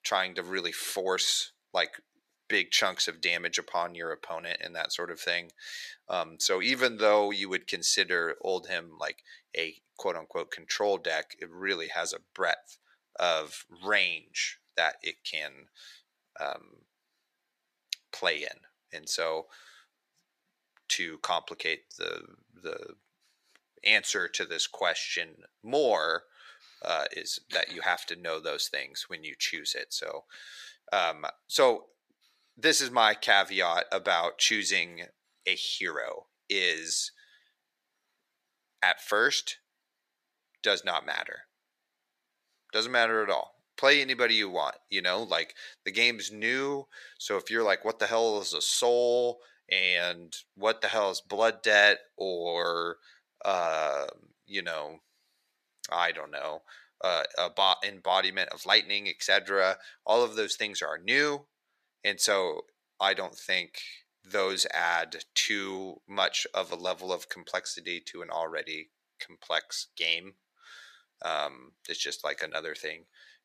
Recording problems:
thin; very; fading below 550 Hz

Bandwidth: 14.5 kHz